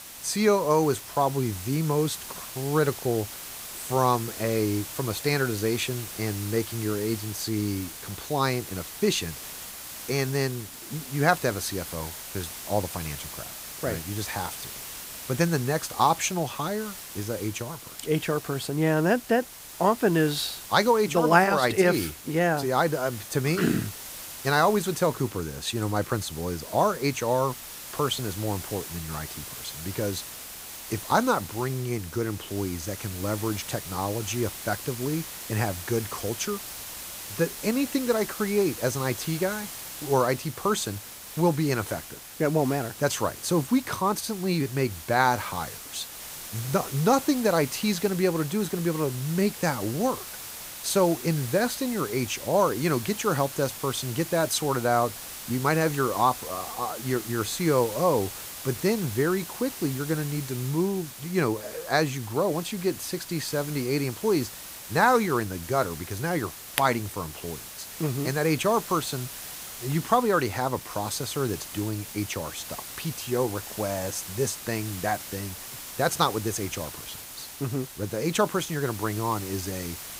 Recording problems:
hiss; noticeable; throughout; 10 dB below the speech

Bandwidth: 15.5 kHz